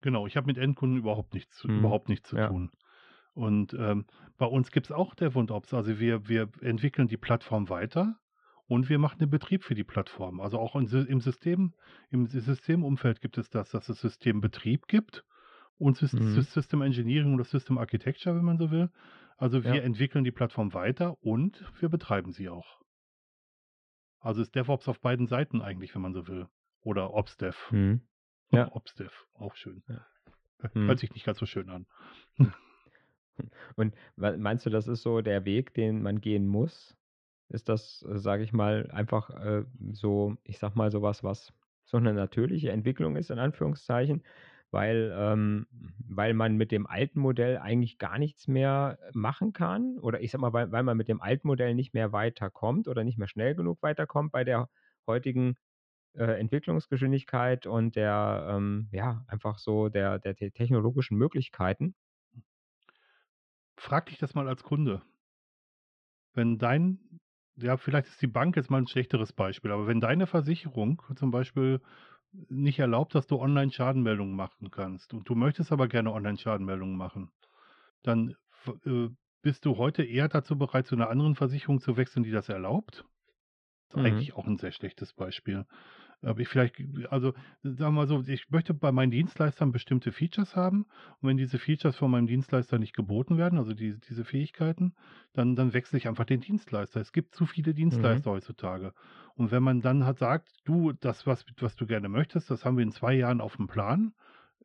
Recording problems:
muffled; slightly; fading above 3.5 kHz

